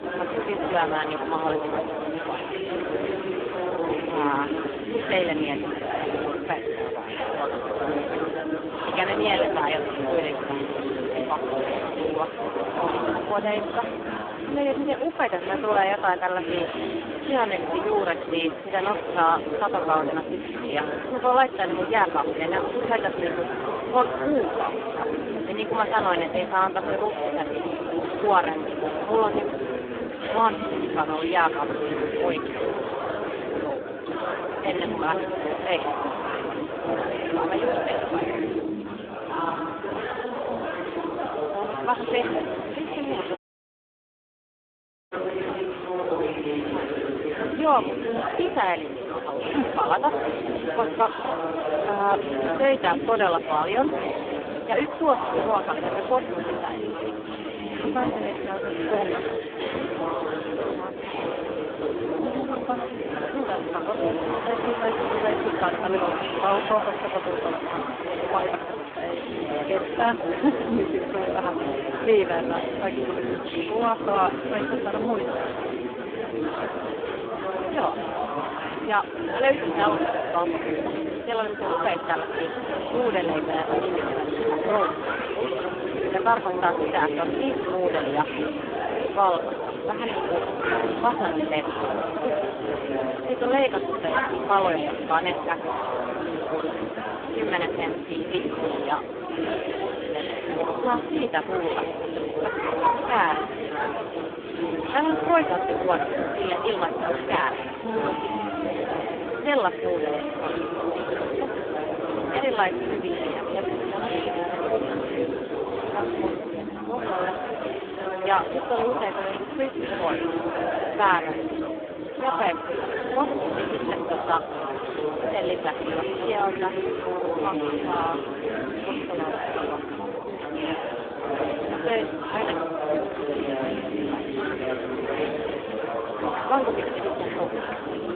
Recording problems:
phone-call audio; poor line
chatter from many people; loud; throughout; 1 dB below the speech
audio cutting out; at 43 s for 1.5 s

